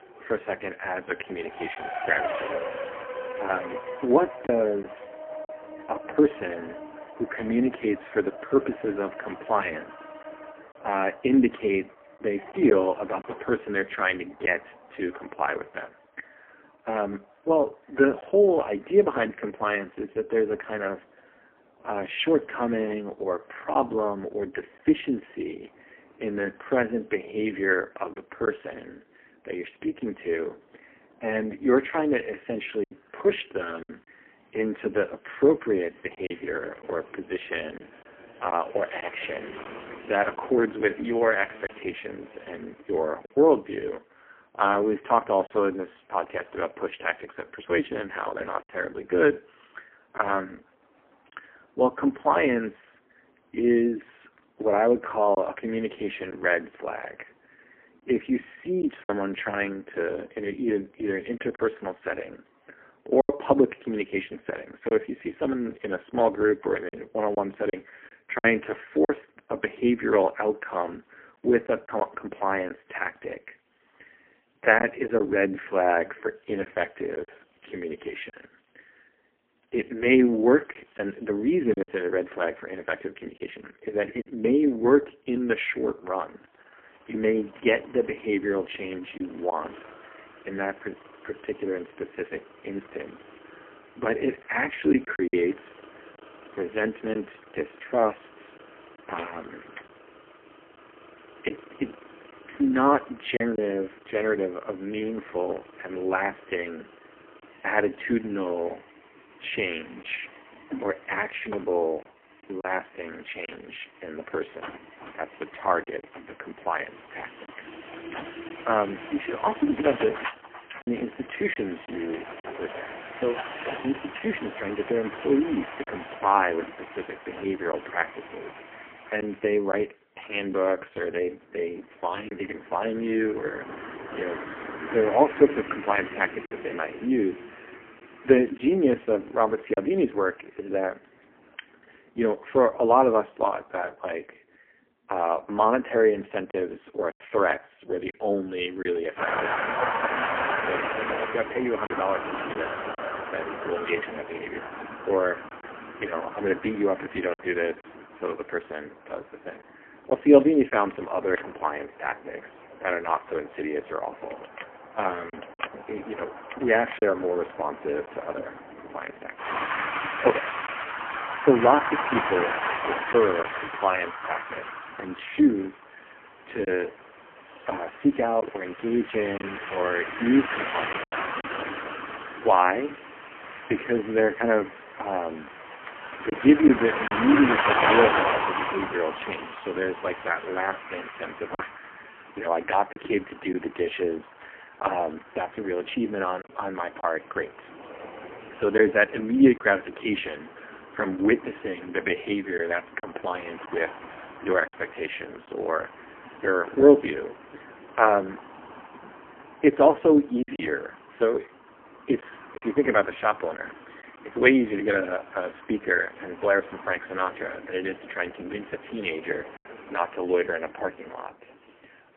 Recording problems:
phone-call audio; poor line; nothing above 3 kHz
traffic noise; loud; throughout; 8 dB below the speech
choppy; occasionally; 2% of the speech affected

